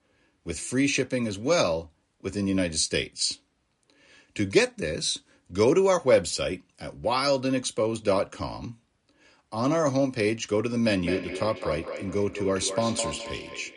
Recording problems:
echo of what is said; strong; from 11 s on; 210 ms later, 10 dB below the speech
garbled, watery; slightly; nothing above 10 kHz

